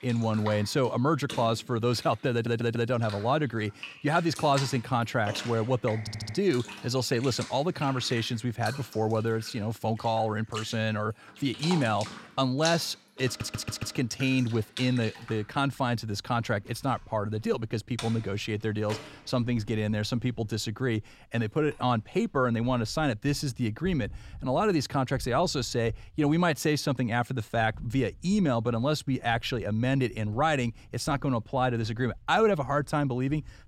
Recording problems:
household noises; noticeable; throughout; 15 dB below the speech
audio stuttering; at 2.5 s, at 6 s and at 13 s

